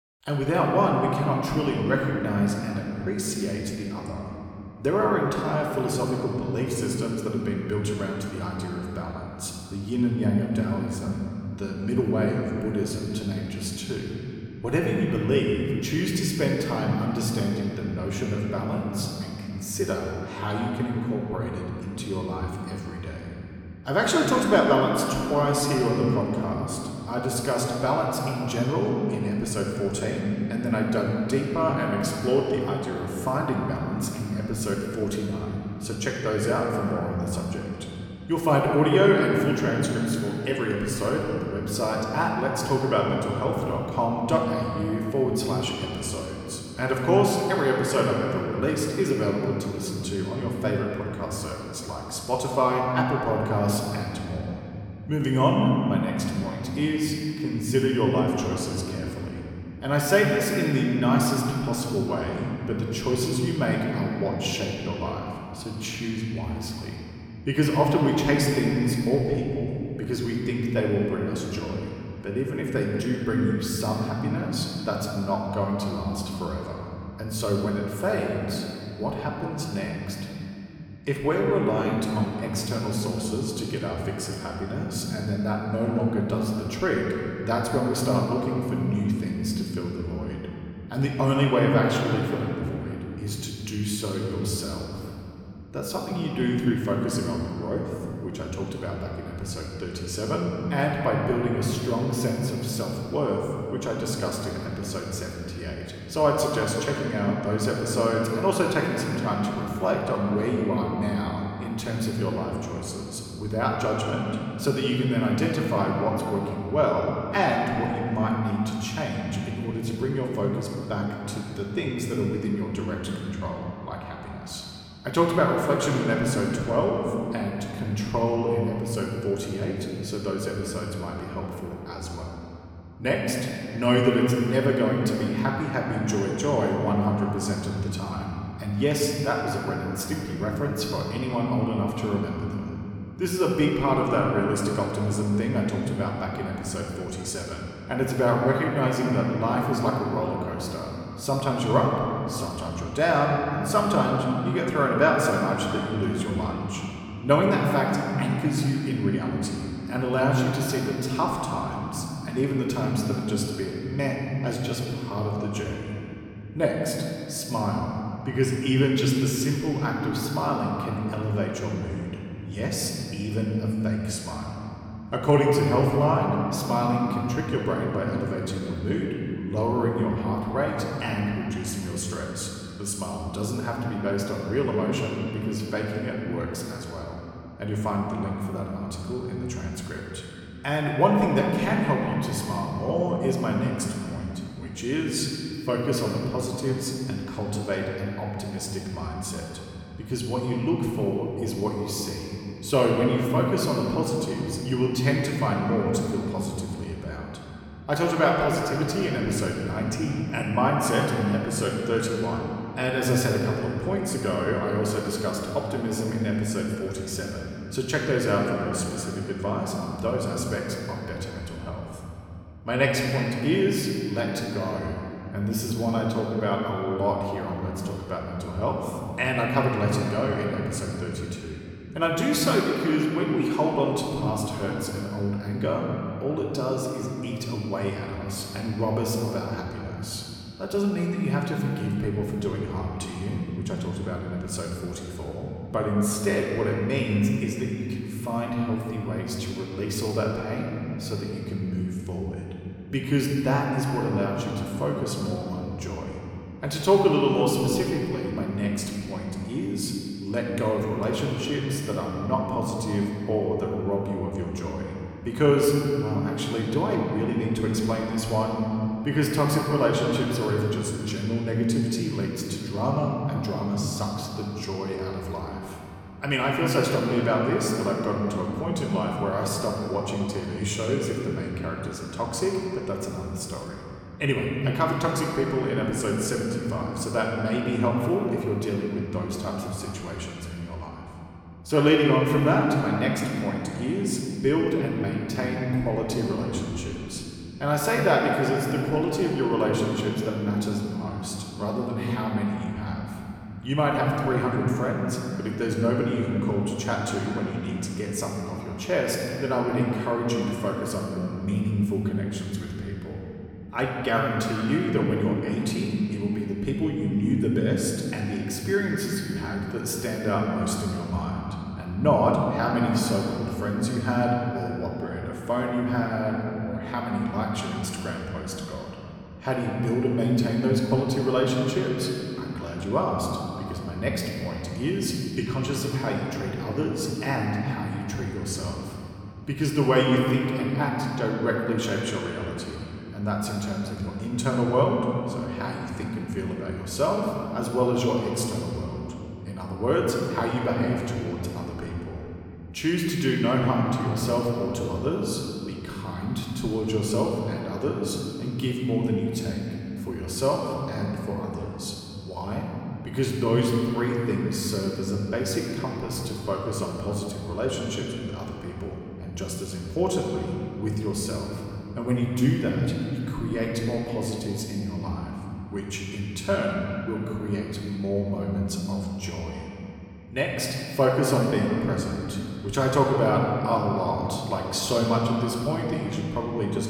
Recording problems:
room echo; noticeable; dies away in 3 s
off-mic speech; somewhat distant

